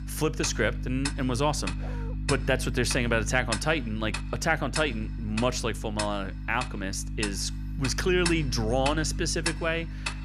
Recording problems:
household noises; loud; throughout; 8 dB below the speech
electrical hum; noticeable; throughout; 50 Hz, 20 dB below the speech
dog barking; faint; at 2 s; peak 15 dB below the speech

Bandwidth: 15 kHz